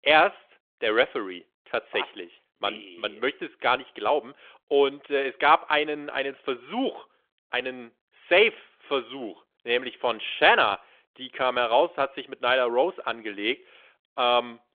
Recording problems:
phone-call audio; nothing above 3.5 kHz

